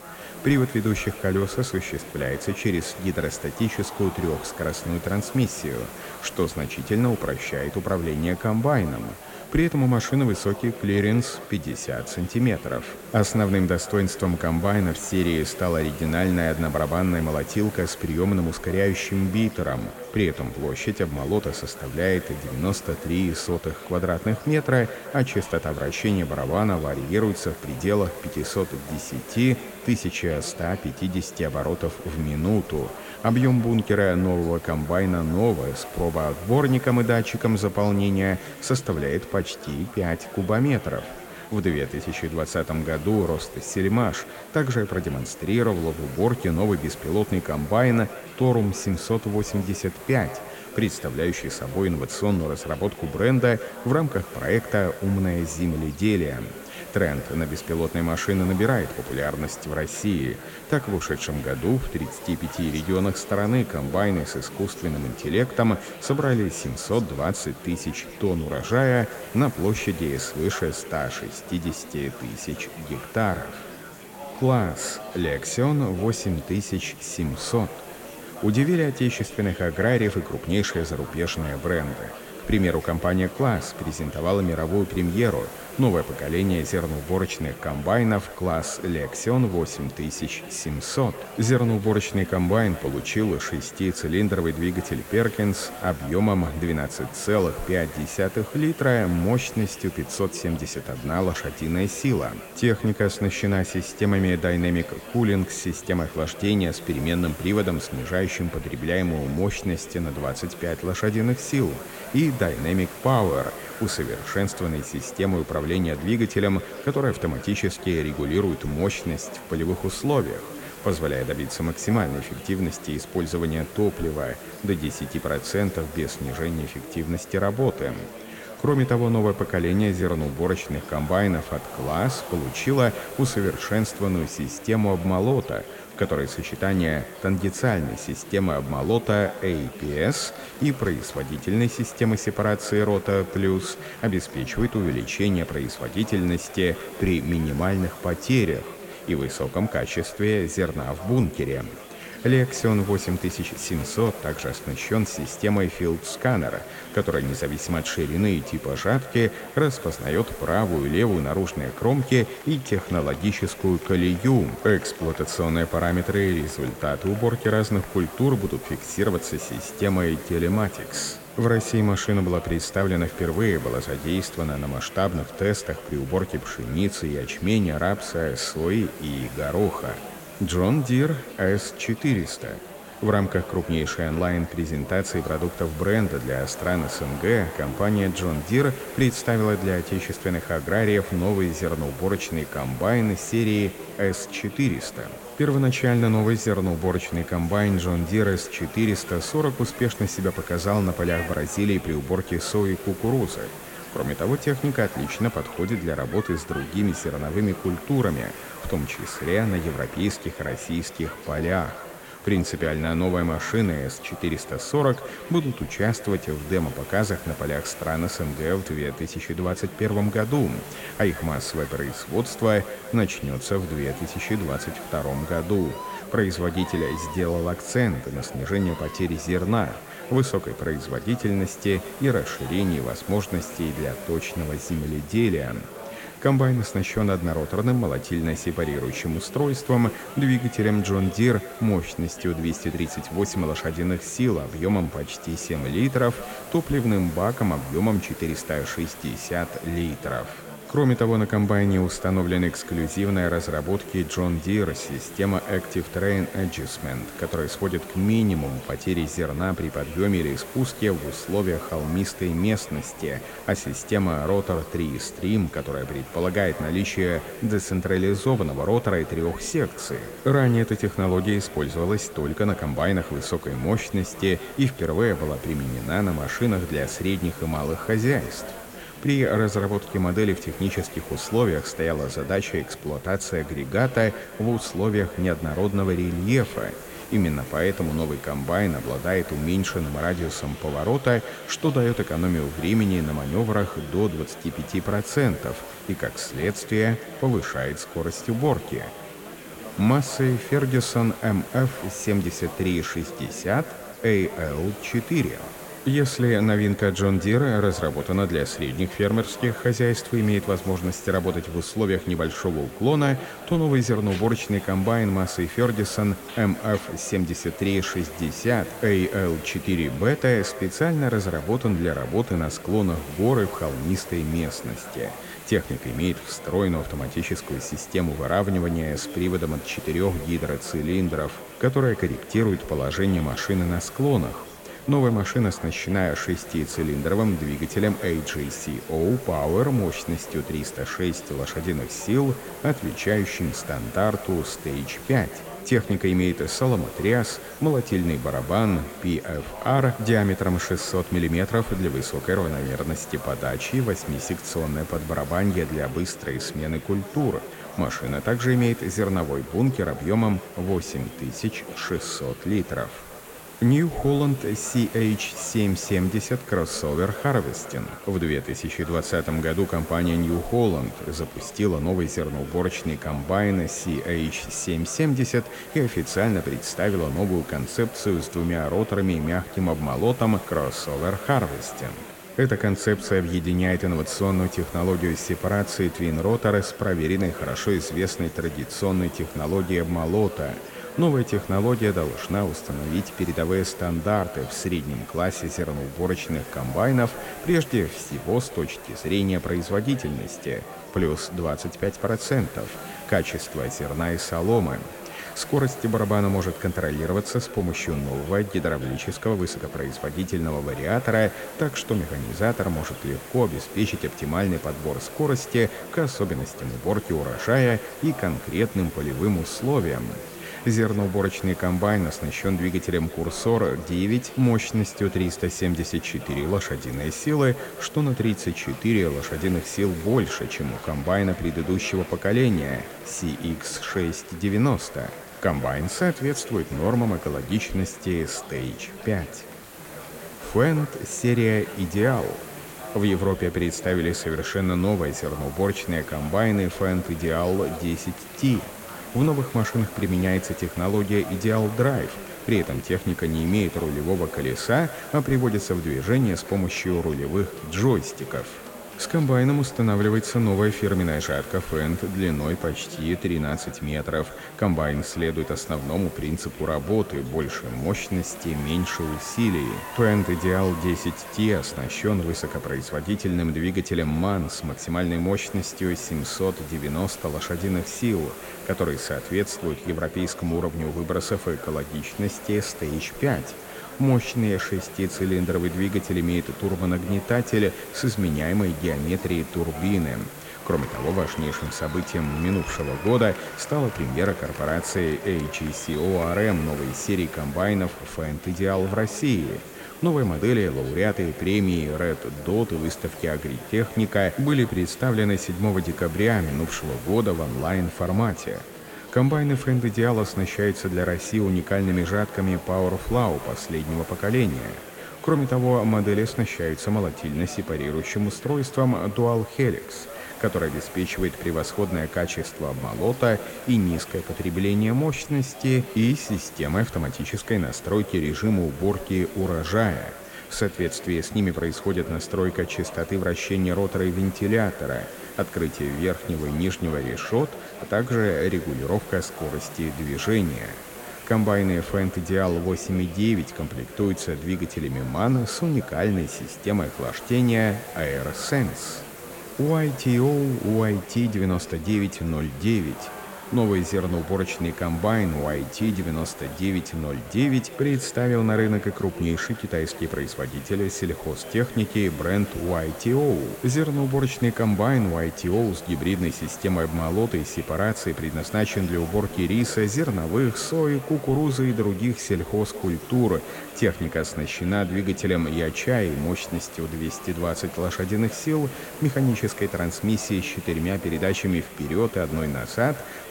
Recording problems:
echo of what is said; faint; throughout; 160 ms later, 20 dB below the speech
chatter from many people; noticeable; throughout; 15 dB below the speech
hiss; noticeable; throughout; 20 dB below the speech

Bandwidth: 16.5 kHz